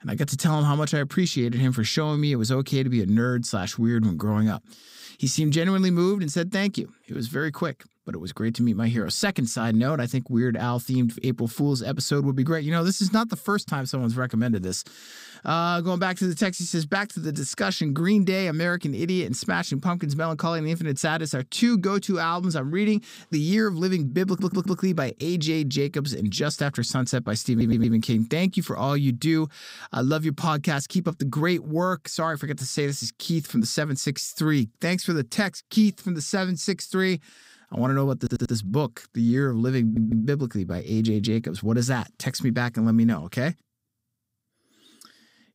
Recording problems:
audio stuttering; 4 times, first at 24 s

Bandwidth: 15.5 kHz